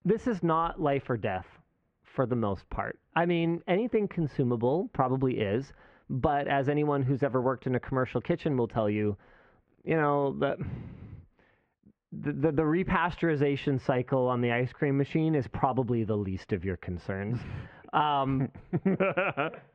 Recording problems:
muffled; very; fading above 2.5 kHz

